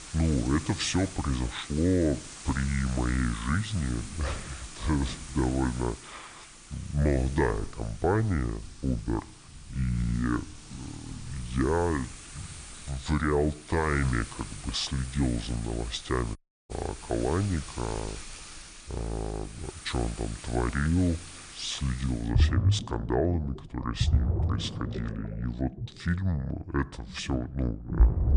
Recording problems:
wrong speed and pitch; too slow and too low; 0.7 times normal speed
rain or running water; loud; throughout; 6 dB below the speech
audio cutting out; at 16 s

